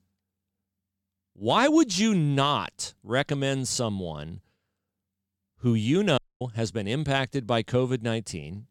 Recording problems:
audio cutting out; at 6 s

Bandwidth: 17.5 kHz